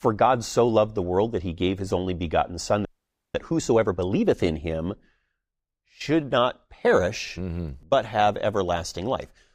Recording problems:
audio freezing; at 3 s

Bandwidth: 15.5 kHz